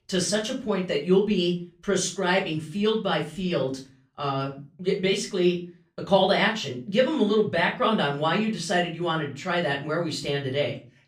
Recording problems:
off-mic speech; far
room echo; slight; dies away in 0.3 s

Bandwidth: 15 kHz